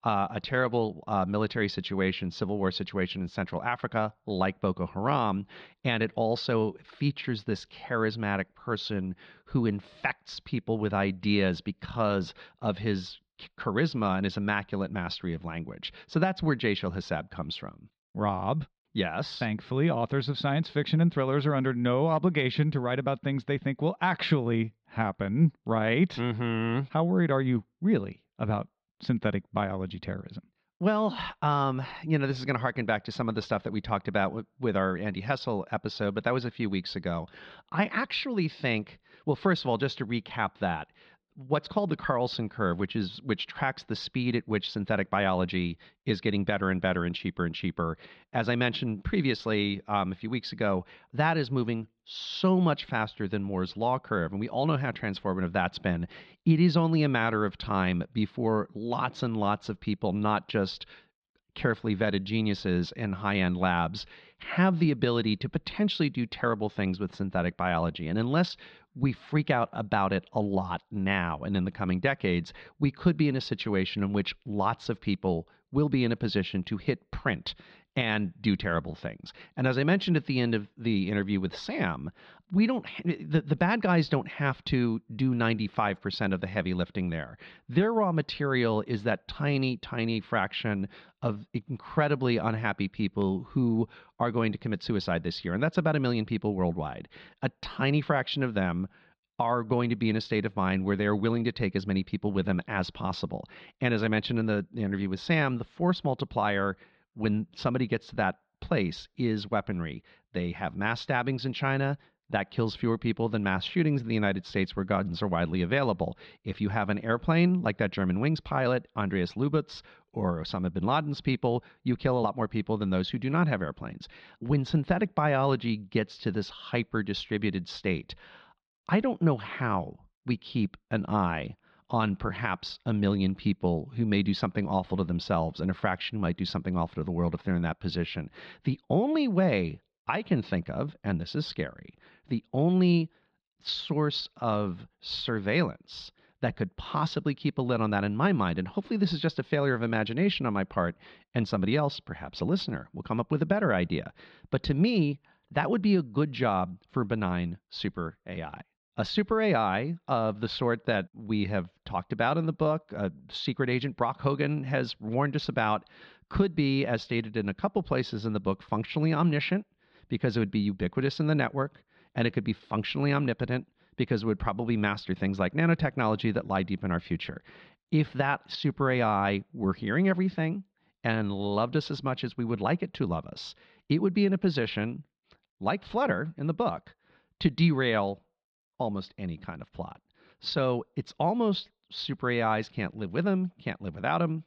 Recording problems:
muffled; slightly; fading above 4 kHz

